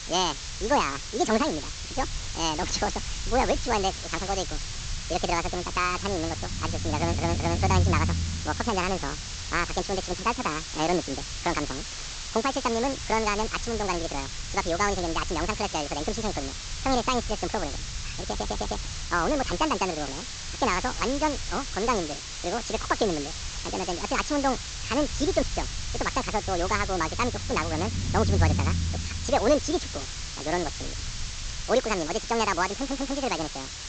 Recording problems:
wrong speed and pitch; too fast and too high; 1.7 times normal speed
high frequencies cut off; noticeable; nothing above 8 kHz
hiss; loud; throughout; 7 dB below the speech
low rumble; faint; throughout; 20 dB below the speech
audio stuttering; at 7 s, at 18 s and at 33 s

